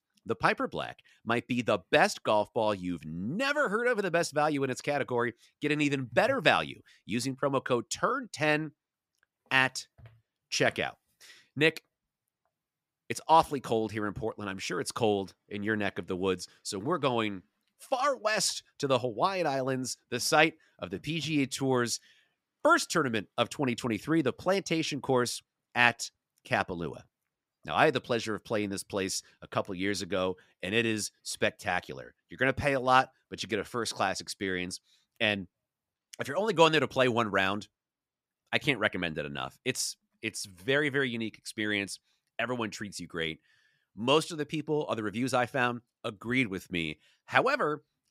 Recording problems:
none

